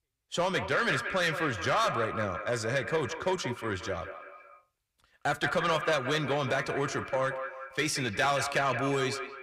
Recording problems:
echo of what is said; strong; throughout; 180 ms later, 7 dB below the speech
distortion; slight; 10 dB below the speech

